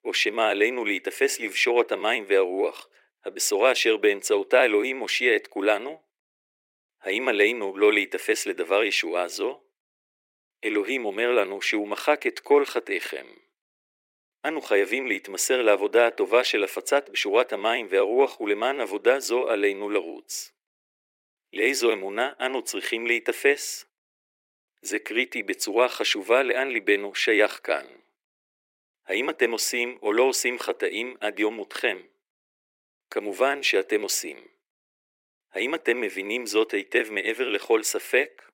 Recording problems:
thin; very; fading below 350 Hz

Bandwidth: 16 kHz